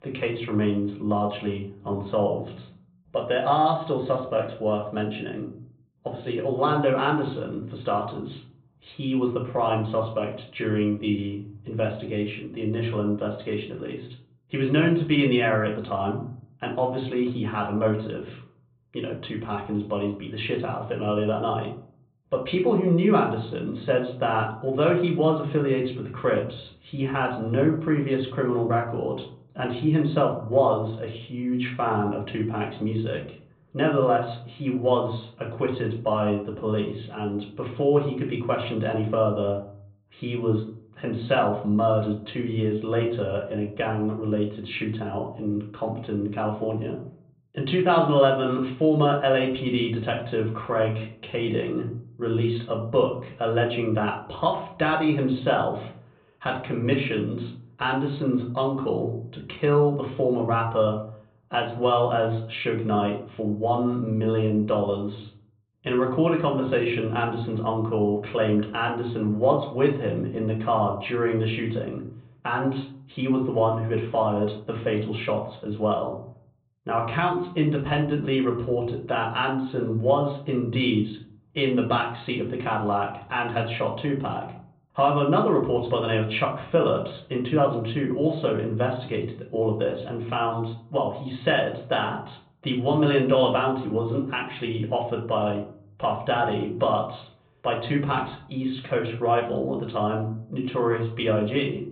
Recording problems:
high frequencies cut off; severe; nothing above 4 kHz
room echo; slight; dies away in 0.5 s
off-mic speech; somewhat distant

